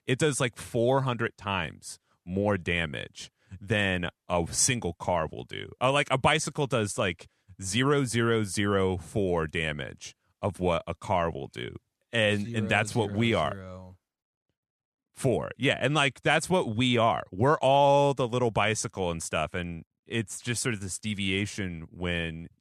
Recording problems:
none

